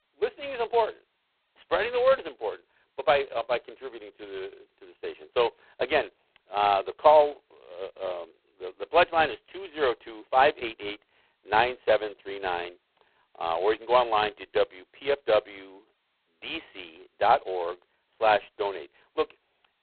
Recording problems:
phone-call audio; poor line; nothing above 4 kHz

